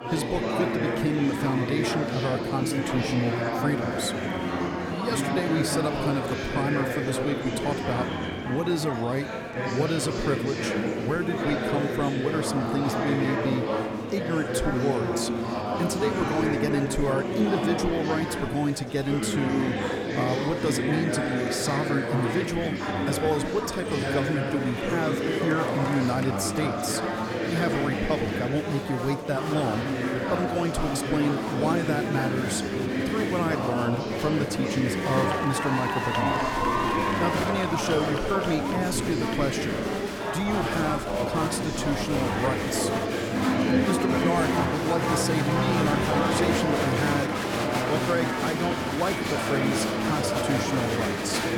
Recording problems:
murmuring crowd; very loud; throughout; 2 dB above the speech

